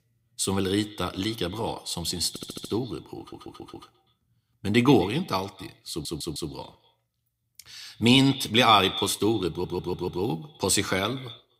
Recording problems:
echo of what is said; noticeable; throughout; 120 ms later, 15 dB below the speech
audio stuttering; 4 times, first at 2.5 s

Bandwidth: 15.5 kHz